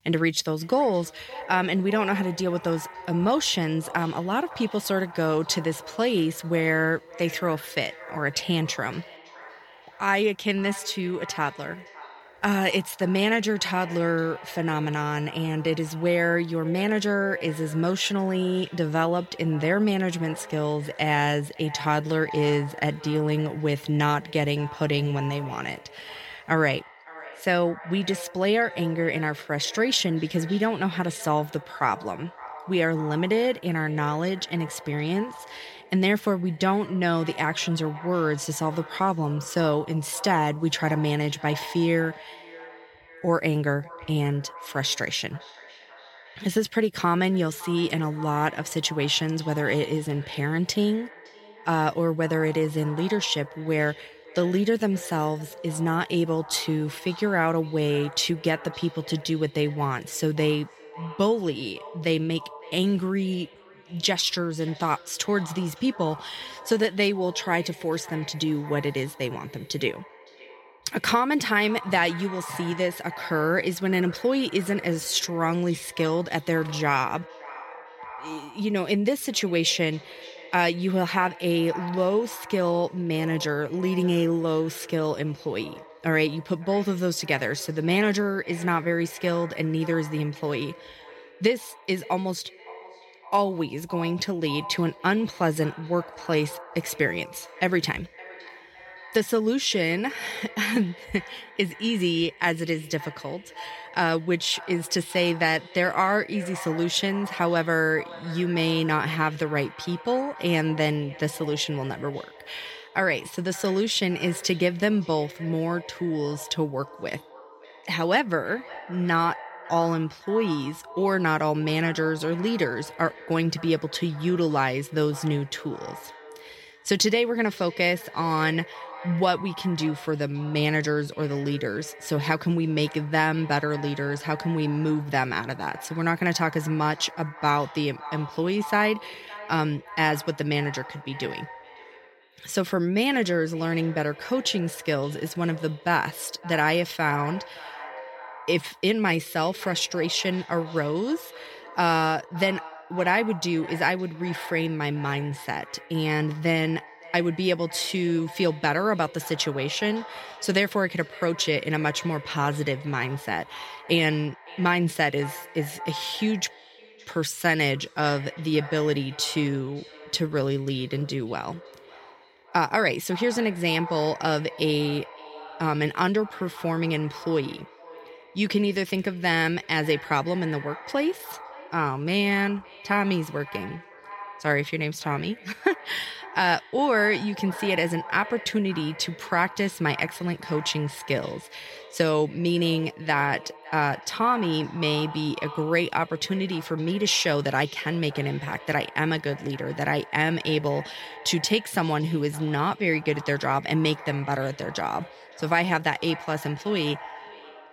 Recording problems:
echo of what is said; noticeable; throughout; 560 ms later, 15 dB below the speech

